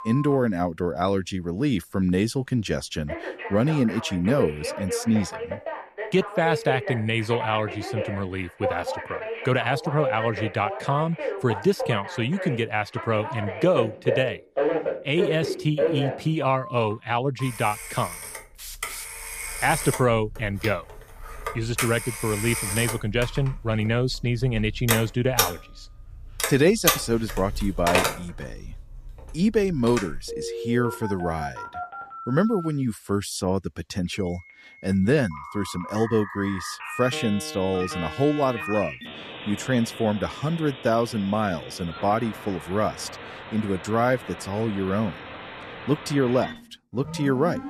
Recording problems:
alarms or sirens; loud; throughout; 6 dB below the speech

